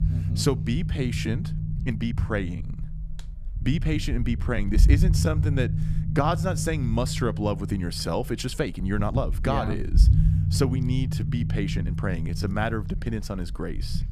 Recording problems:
low rumble; loud; throughout; 9 dB below the speech
uneven, jittery; strongly; from 1 to 13 s

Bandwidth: 14.5 kHz